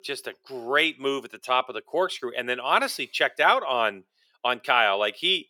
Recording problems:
thin; somewhat; fading below 450 Hz

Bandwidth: 17.5 kHz